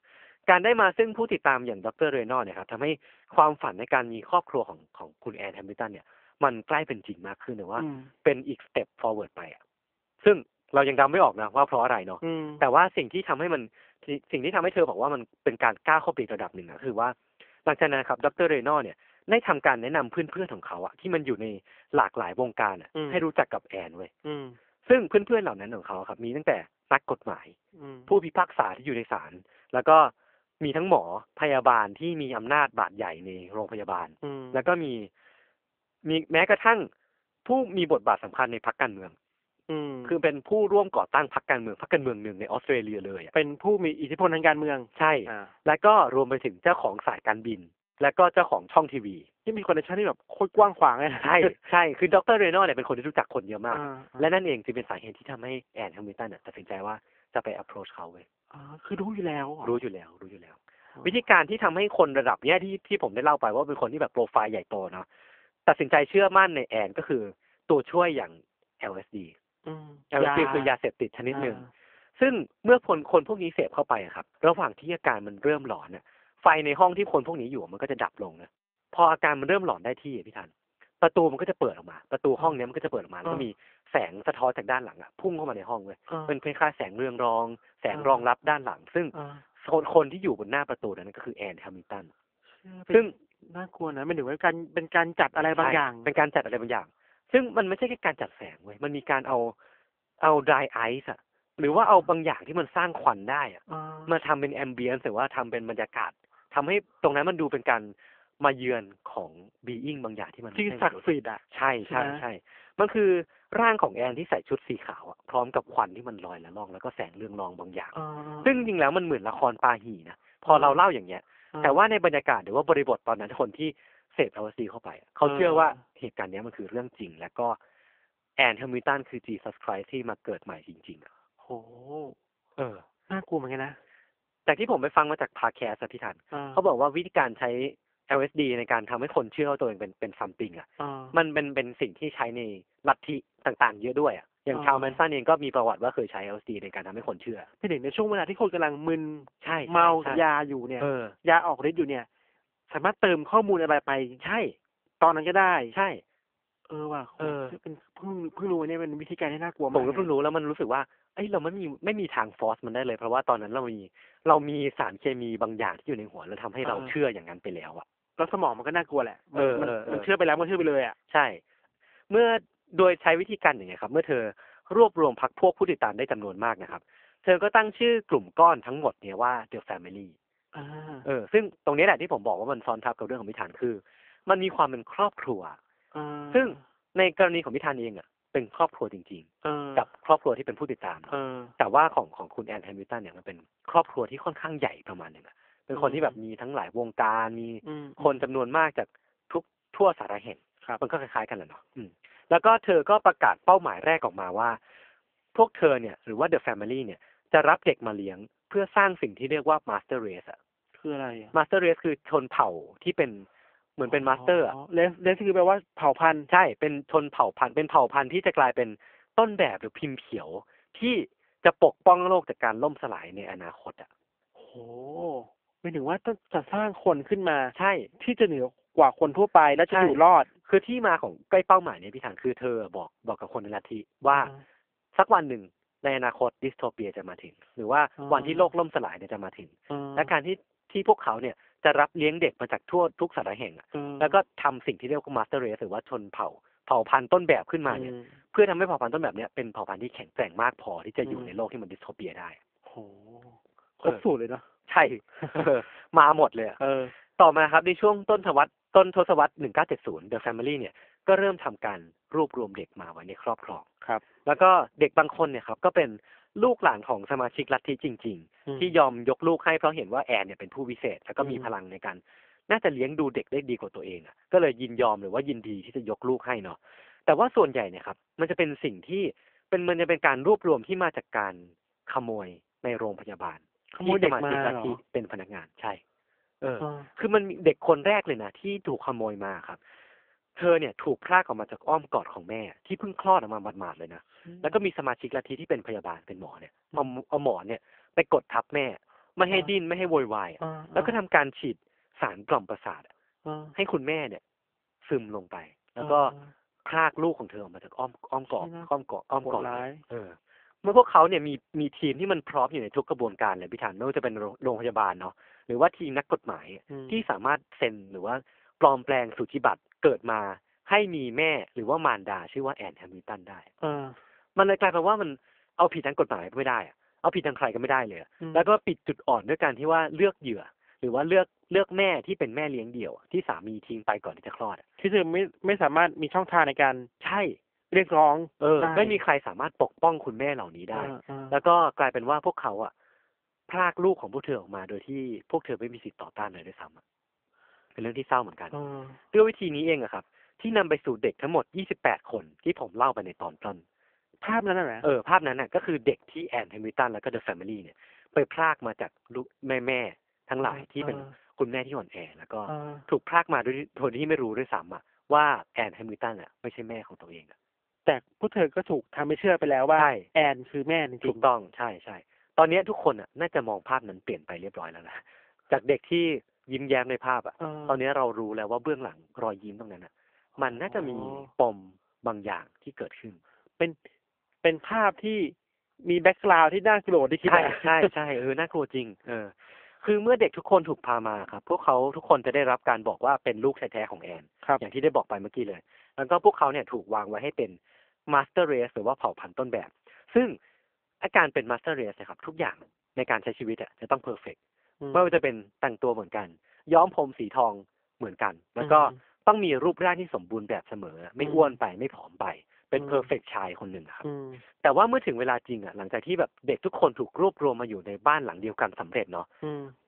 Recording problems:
phone-call audio; poor line; nothing above 3 kHz

